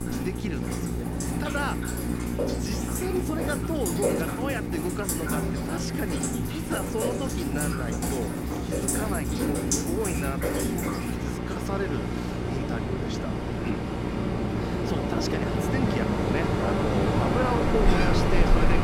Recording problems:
rain or running water; very loud; throughout; 4 dB above the speech
electrical hum; loud; throughout; 60 Hz, 6 dB below the speech

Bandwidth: 16 kHz